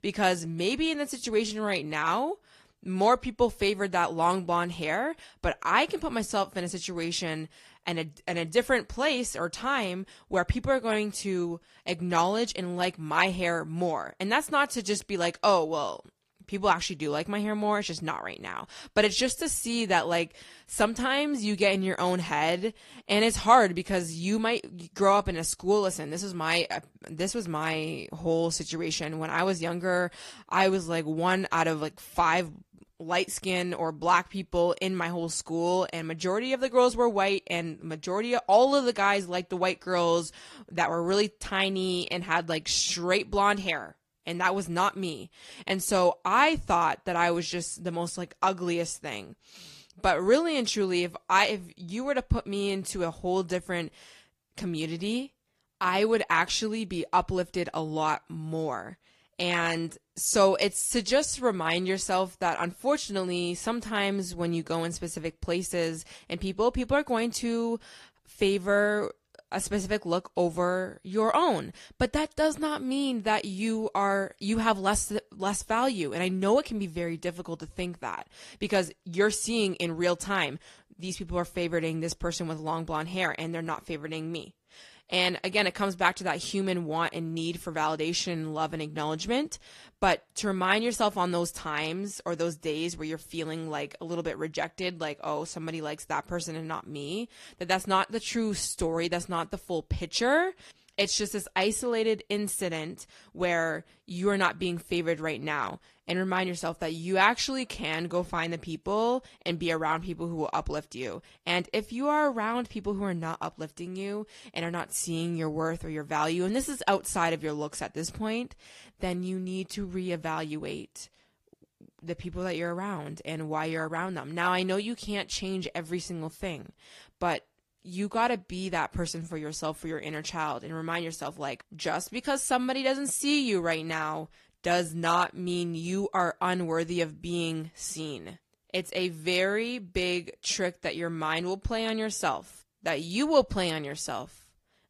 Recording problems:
garbled, watery; slightly

